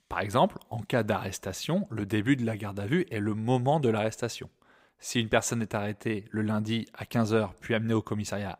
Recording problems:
none

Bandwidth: 15.5 kHz